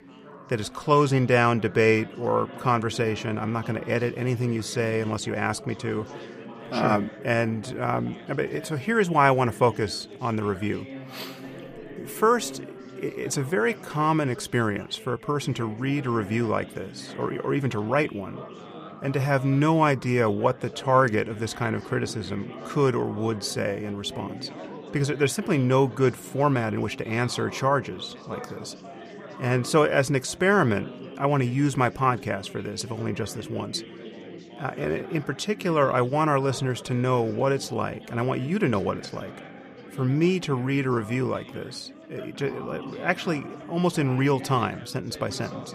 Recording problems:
chatter from many people; noticeable; throughout; 15 dB below the speech

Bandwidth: 15 kHz